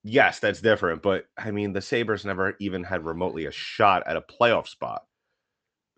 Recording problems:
high frequencies cut off; noticeable; nothing above 8 kHz

